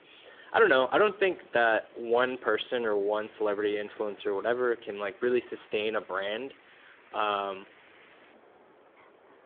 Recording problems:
phone-call audio; nothing above 3.5 kHz
wind in the background; faint; throughout; 25 dB below the speech

